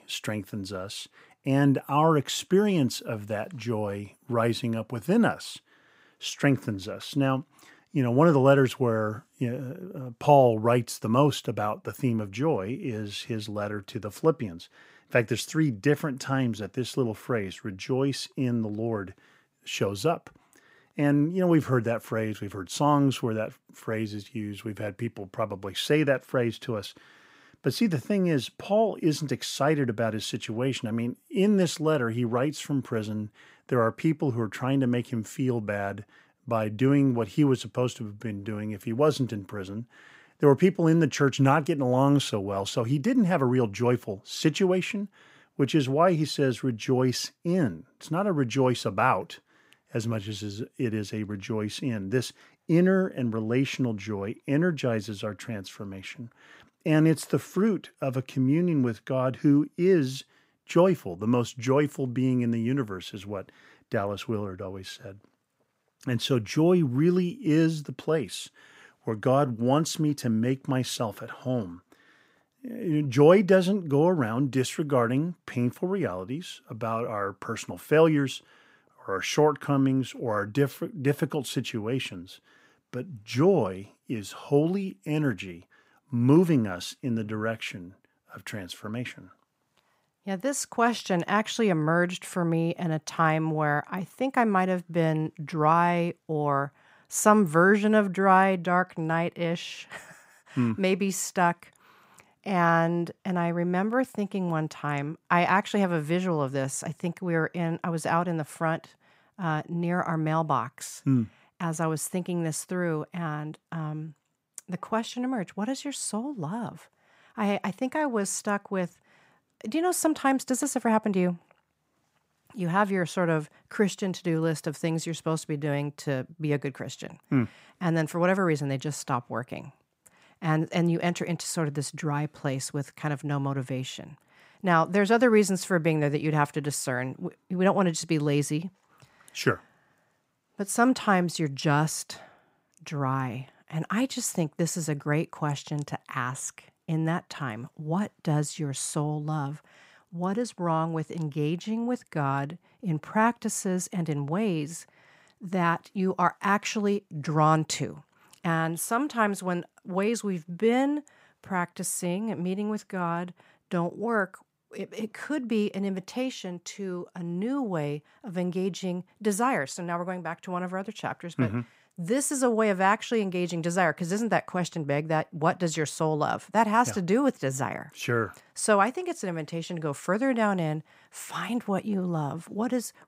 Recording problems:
none

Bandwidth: 15.5 kHz